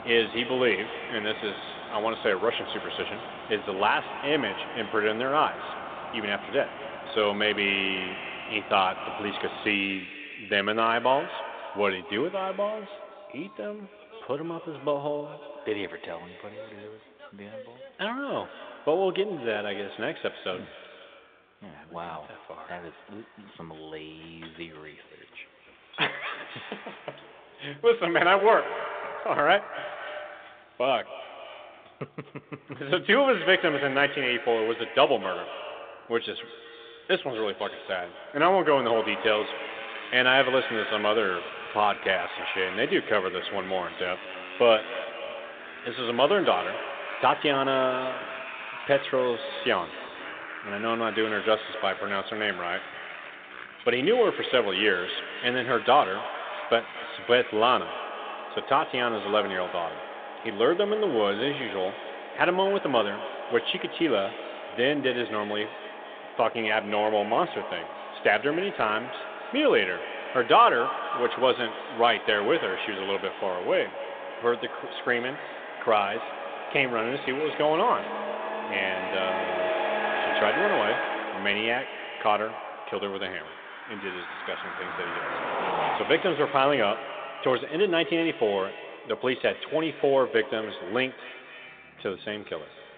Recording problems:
echo of what is said; noticeable; throughout; 240 ms later, 15 dB below the speech
phone-call audio
traffic noise; noticeable; throughout; 10 dB below the speech

